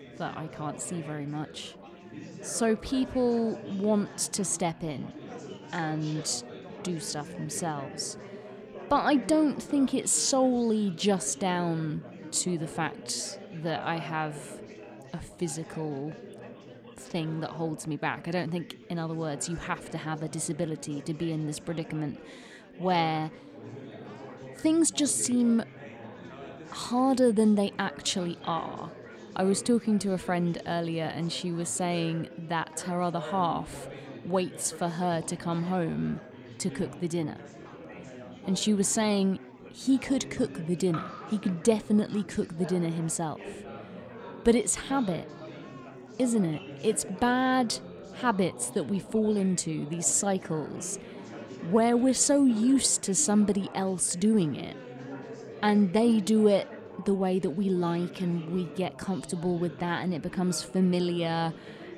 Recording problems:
chatter from many people; noticeable; throughout; 15 dB below the speech

